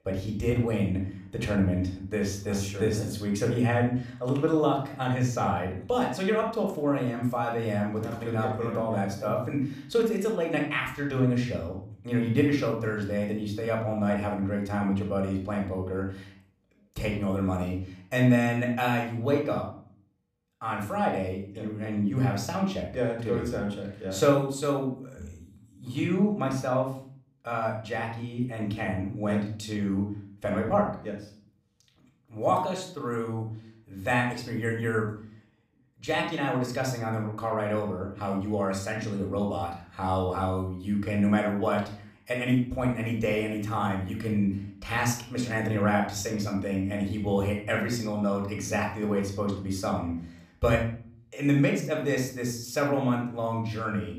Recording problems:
room echo; slight; dies away in 0.5 s
off-mic speech; somewhat distant

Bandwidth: 15 kHz